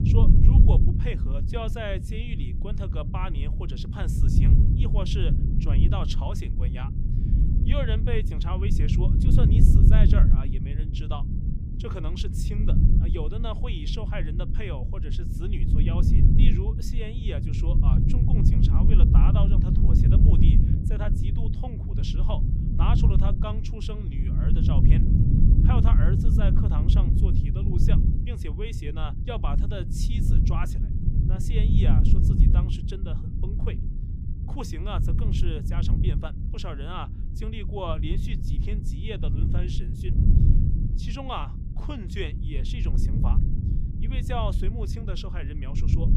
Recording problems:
low rumble; loud; throughout; as loud as the speech

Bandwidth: 15 kHz